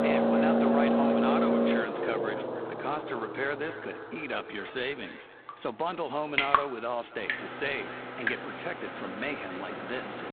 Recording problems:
phone-call audio; poor line; nothing above 4 kHz
echo of what is said; noticeable; throughout; 280 ms later, 15 dB below the speech
traffic noise; very loud; throughout; 5 dB above the speech
rain or running water; very loud; from 5.5 s on; 4 dB above the speech

